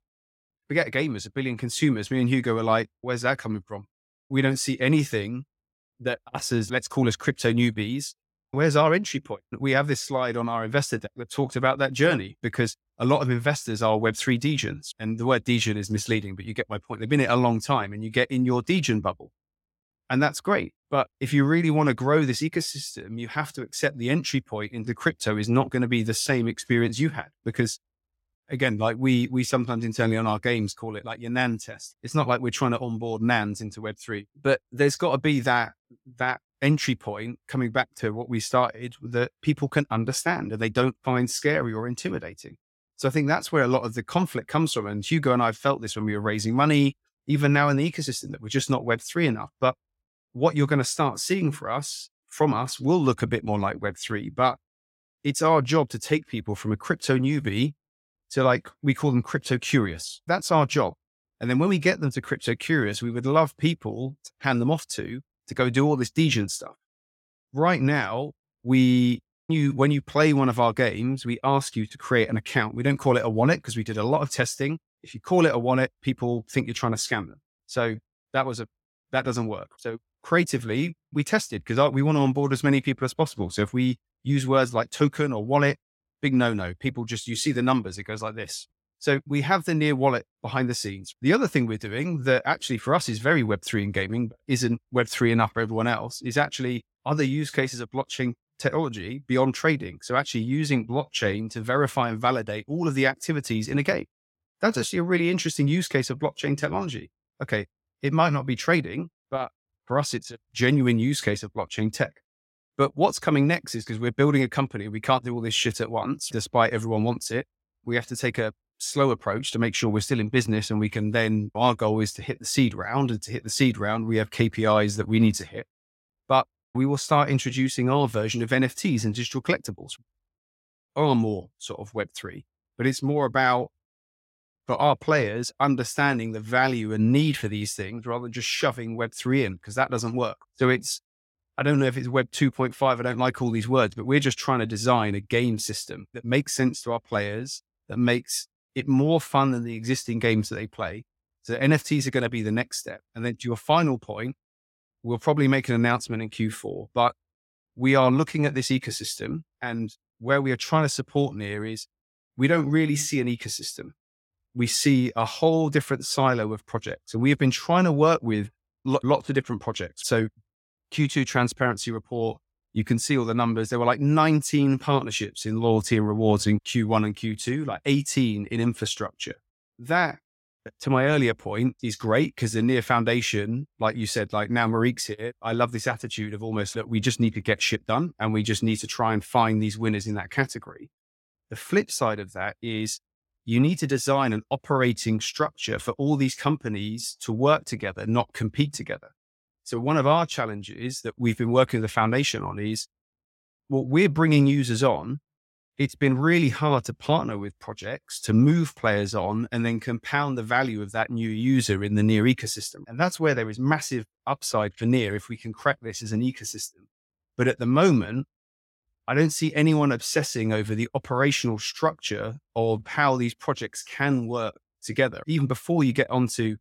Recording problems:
none

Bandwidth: 16.5 kHz